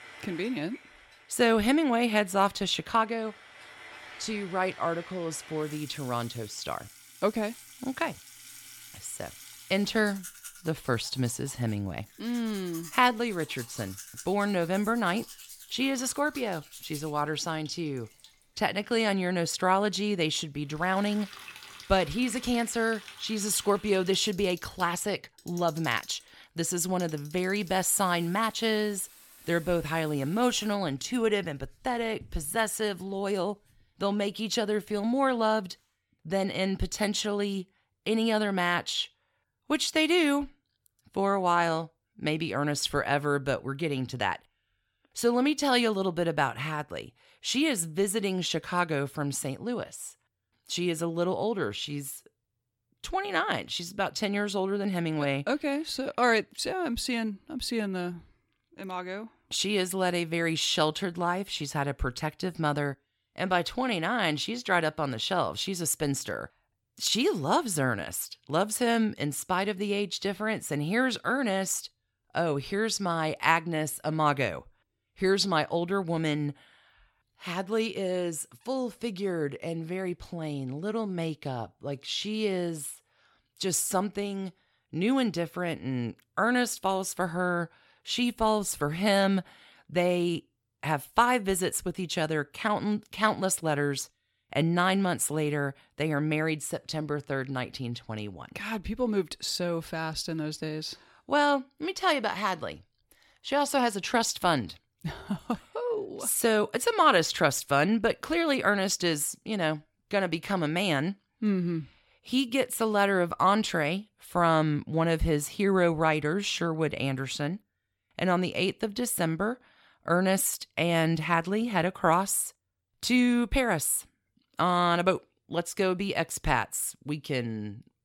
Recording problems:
household noises; noticeable; until 36 s; 20 dB below the speech

